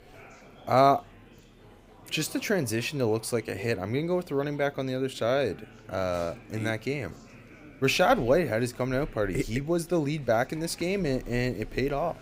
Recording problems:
murmuring crowd; faint; throughout; 25 dB below the speech

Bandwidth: 15.5 kHz